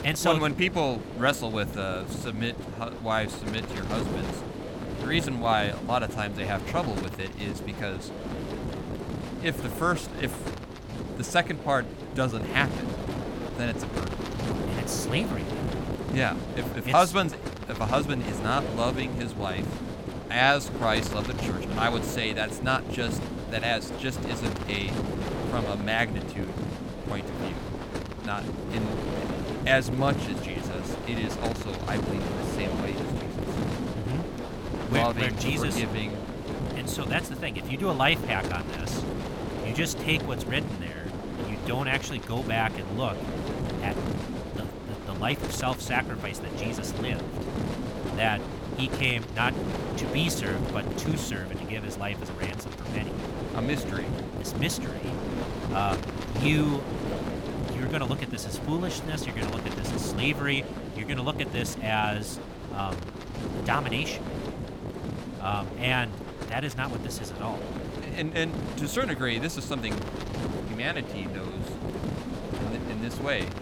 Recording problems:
wind noise on the microphone; heavy; 7 dB below the speech

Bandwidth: 17.5 kHz